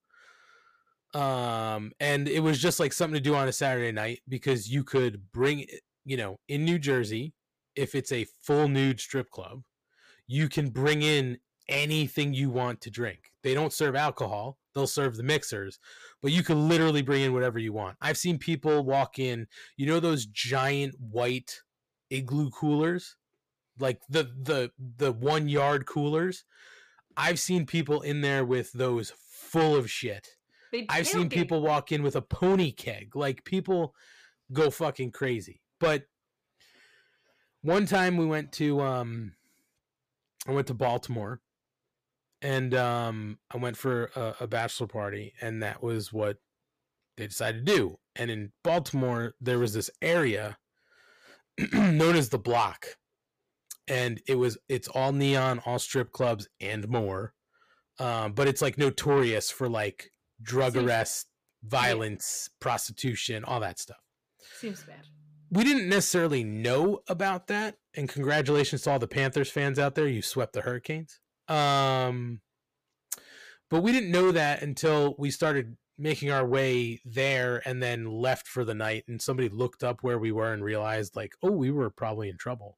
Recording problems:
distortion; slight; 10 dB below the speech

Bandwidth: 15 kHz